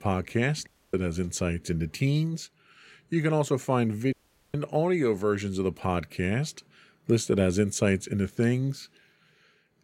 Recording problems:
audio cutting out; at 0.5 s and at 4 s

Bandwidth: 16 kHz